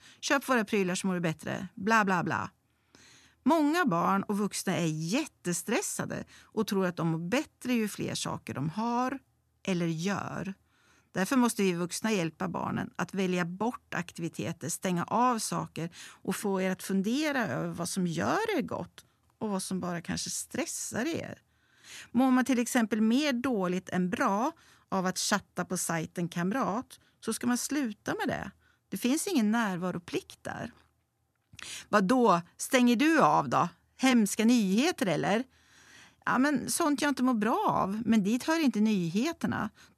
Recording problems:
none

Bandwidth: 13.5 kHz